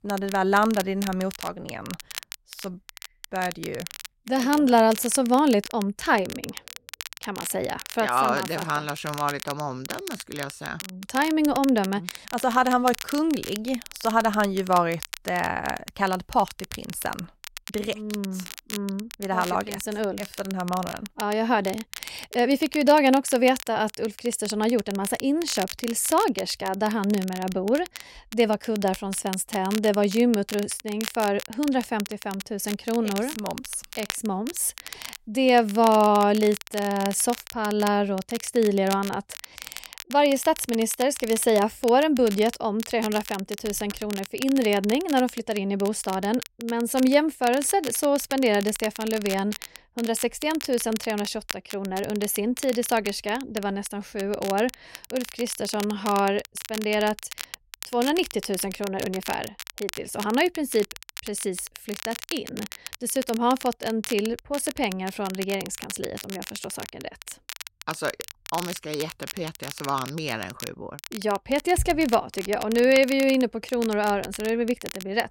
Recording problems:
crackle, like an old record; noticeable; 15 dB below the speech

